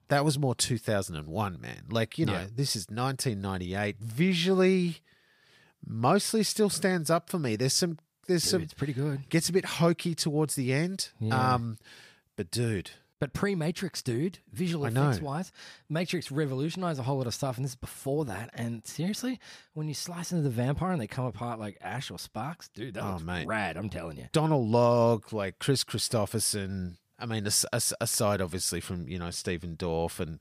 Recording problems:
none

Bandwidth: 15 kHz